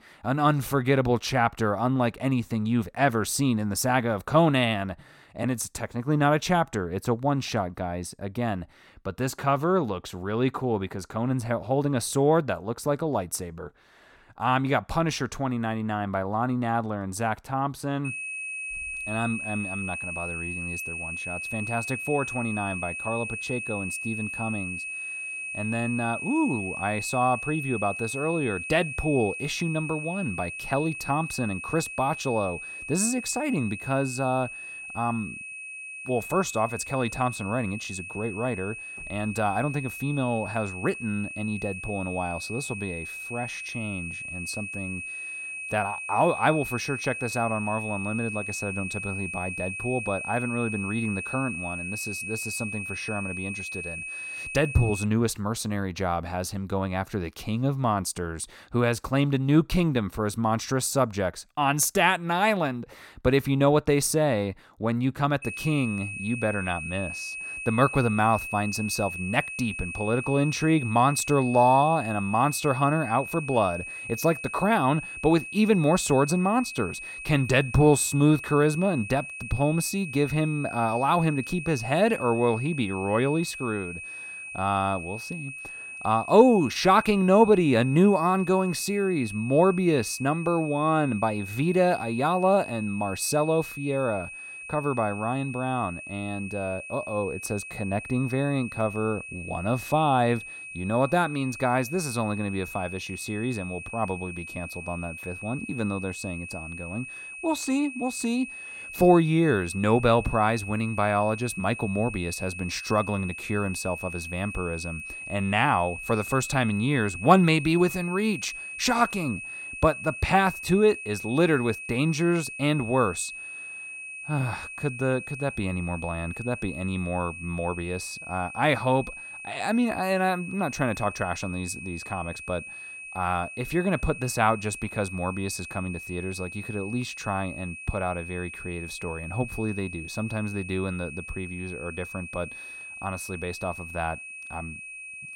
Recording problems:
high-pitched whine; loud; from 18 to 55 s and from 1:05 on; 2.5 kHz, 9 dB below the speech

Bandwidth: 16.5 kHz